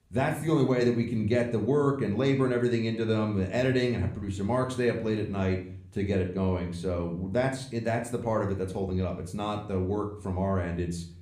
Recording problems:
room echo; slight; dies away in 0.5 s
off-mic speech; somewhat distant

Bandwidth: 15 kHz